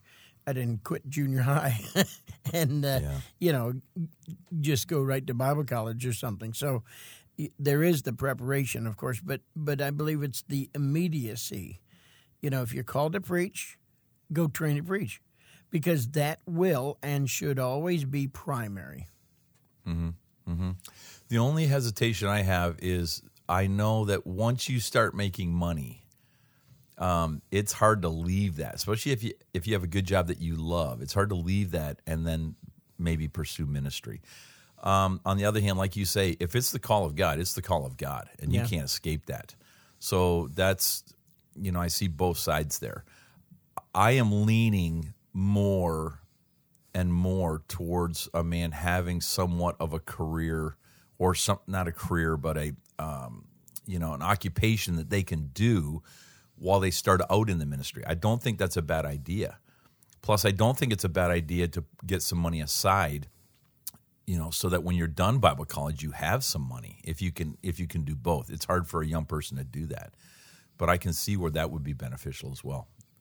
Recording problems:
none

